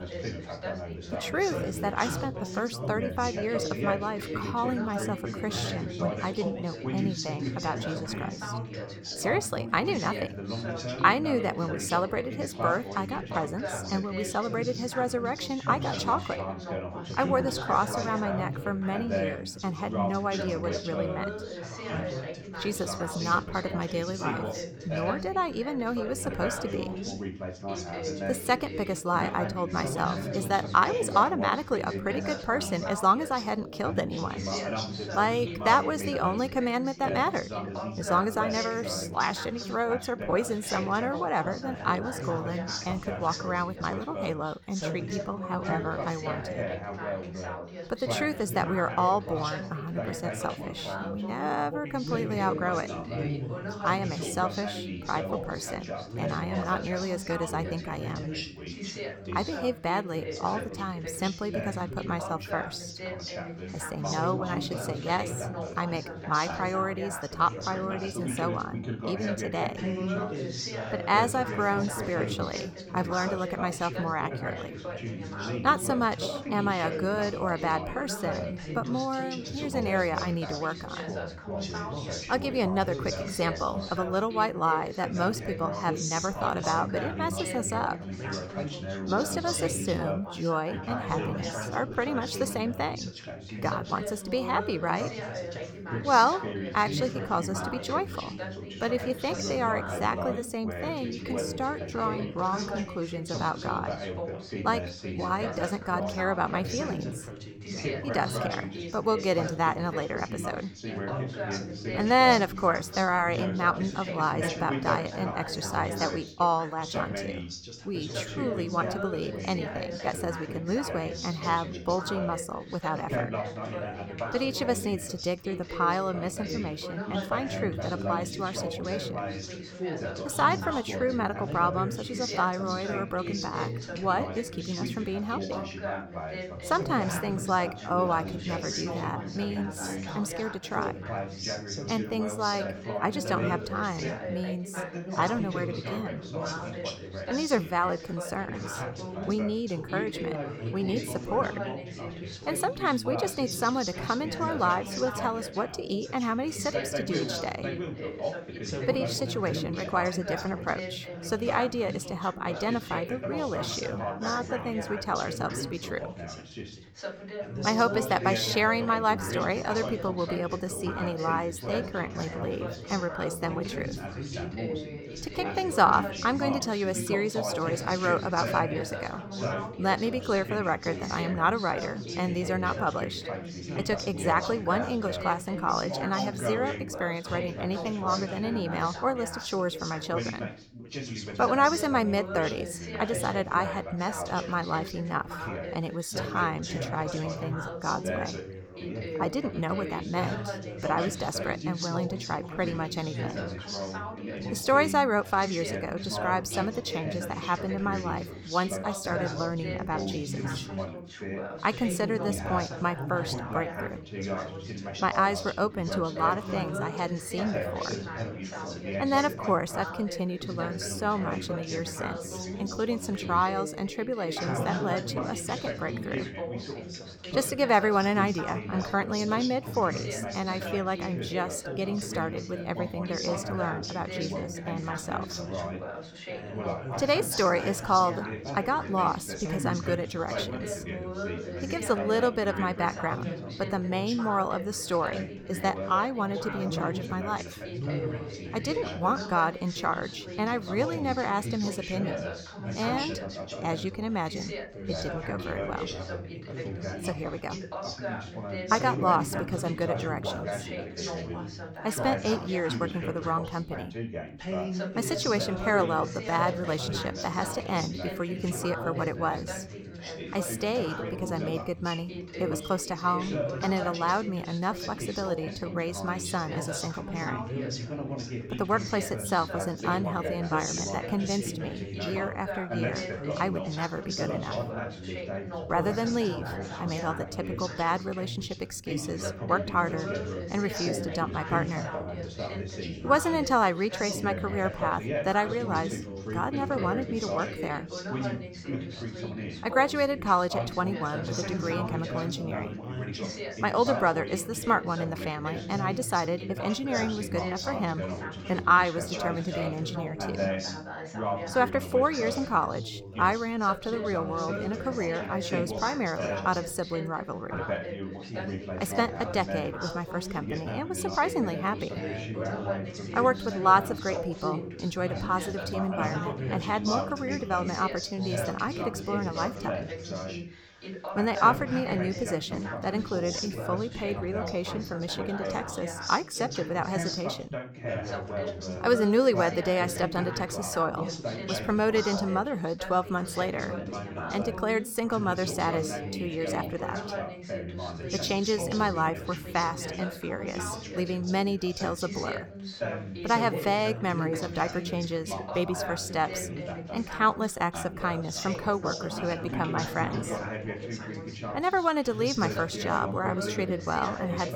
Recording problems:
background chatter; loud; throughout; 3 voices, 5 dB below the speech

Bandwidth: 18.5 kHz